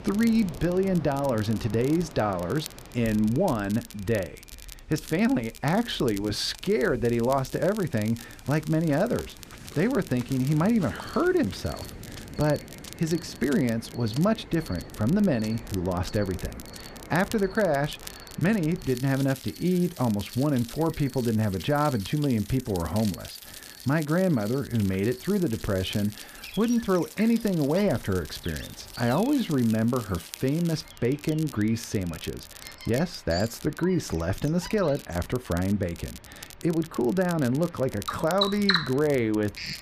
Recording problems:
animal sounds; noticeable; throughout; 15 dB below the speech
rain or running water; noticeable; throughout; 20 dB below the speech
crackle, like an old record; noticeable; 20 dB below the speech

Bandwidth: 14.5 kHz